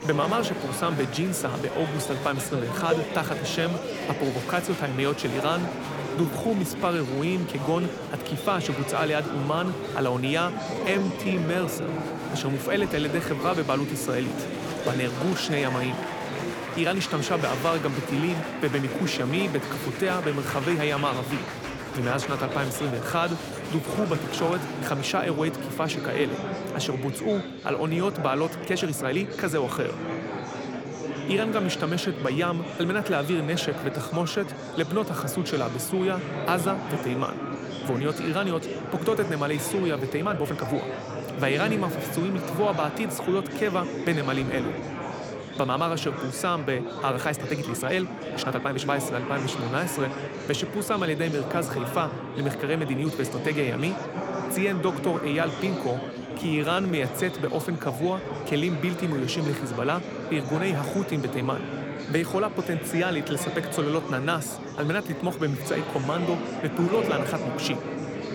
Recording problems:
murmuring crowd; loud; throughout; 5 dB below the speech
uneven, jittery; strongly; from 6 to 57 s

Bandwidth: 18.5 kHz